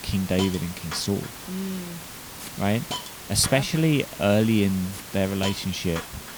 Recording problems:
hiss; noticeable; throughout; 10 dB below the speech

